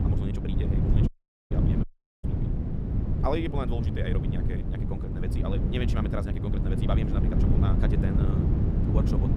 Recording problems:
wrong speed, natural pitch; too fast; 1.7 times normal speed
wind noise on the microphone; heavy; 1 dB below the speech
audio cutting out; at 1 s and at 2 s

